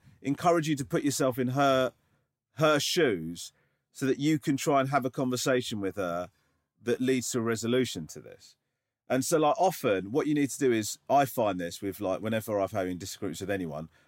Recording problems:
none

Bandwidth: 16 kHz